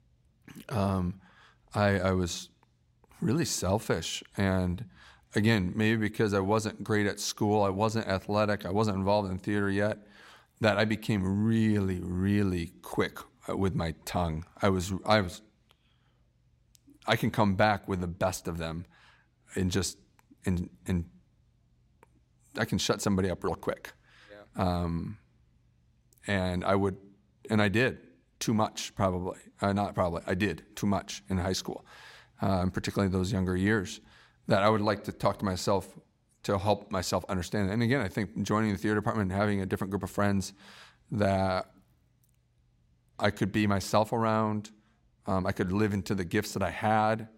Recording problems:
none

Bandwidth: 16 kHz